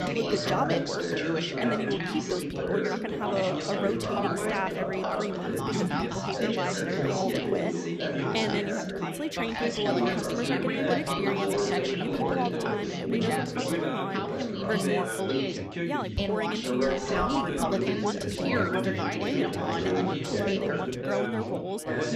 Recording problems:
chatter from many people; very loud; throughout; 4 dB above the speech

